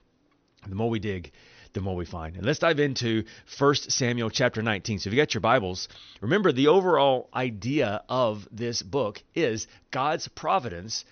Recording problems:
high frequencies cut off; noticeable; nothing above 6 kHz

